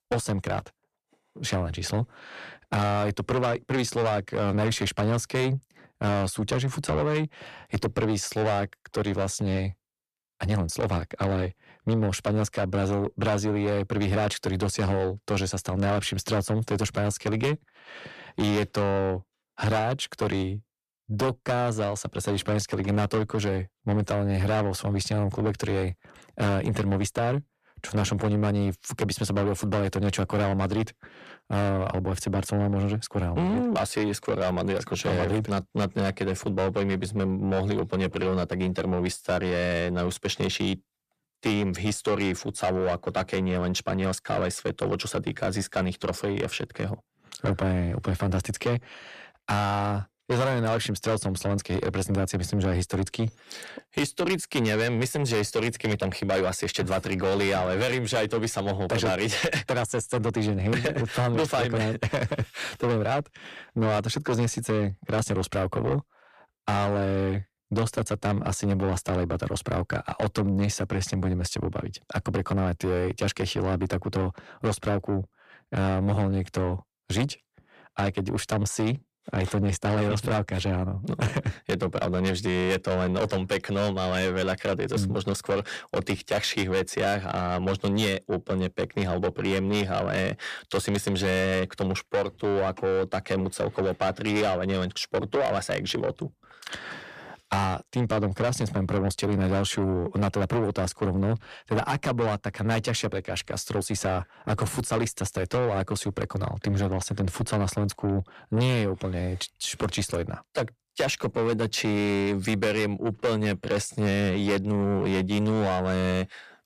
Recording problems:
distortion; heavy; 8 dB below the speech

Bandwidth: 14.5 kHz